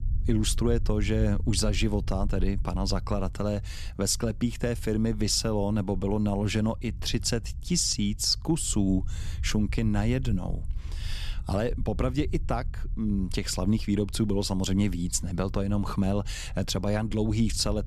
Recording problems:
low rumble; faint; throughout; 25 dB below the speech

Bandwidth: 13.5 kHz